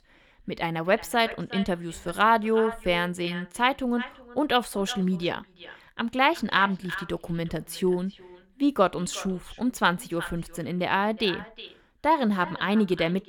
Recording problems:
echo of what is said; noticeable; throughout; 360 ms later, 15 dB below the speech

